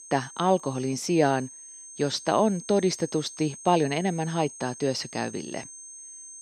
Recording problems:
high-pitched whine; noticeable; throughout; 6.5 kHz, 15 dB below the speech

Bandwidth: 15 kHz